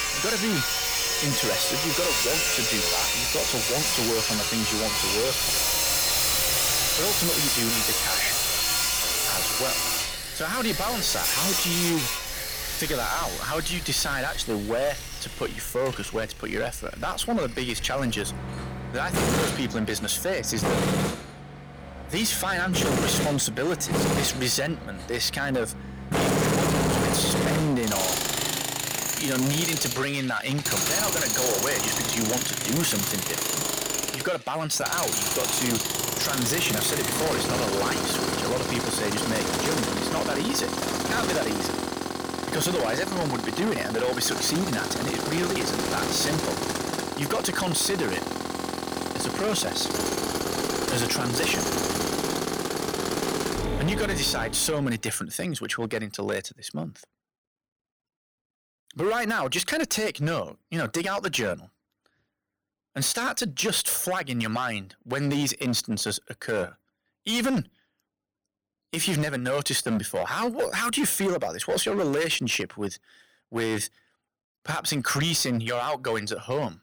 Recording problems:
distortion; heavy; 16% of the sound clipped
machinery noise; very loud; until 54 s; 2 dB above the speech

